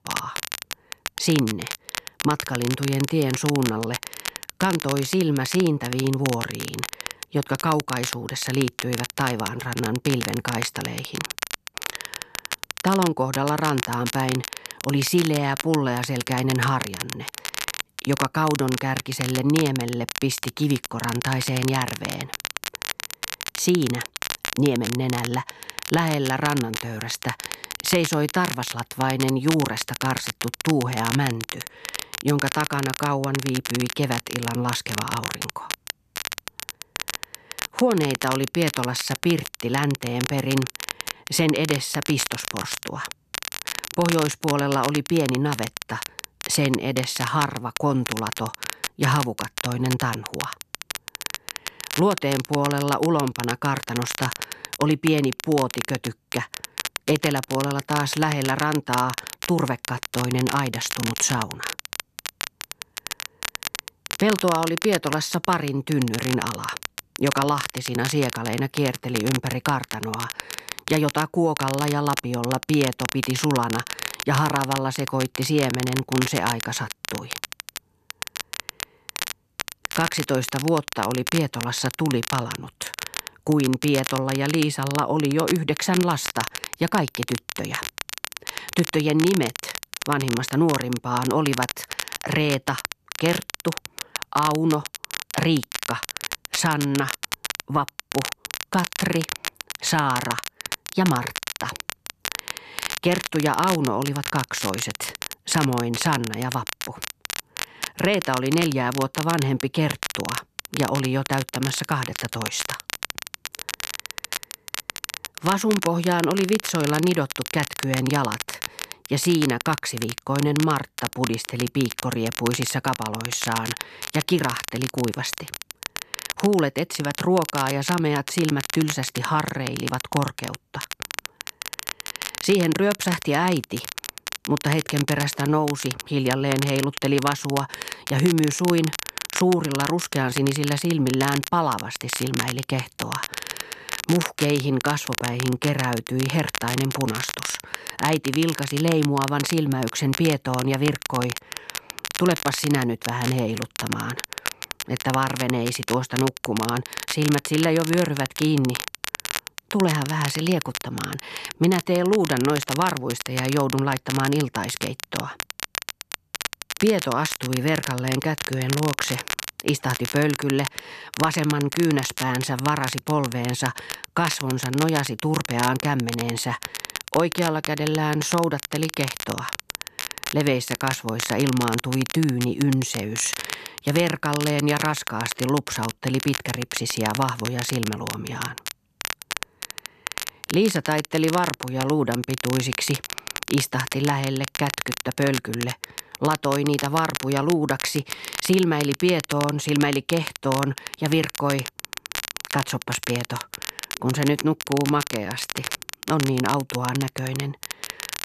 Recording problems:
crackle, like an old record; loud; 7 dB below the speech

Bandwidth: 14 kHz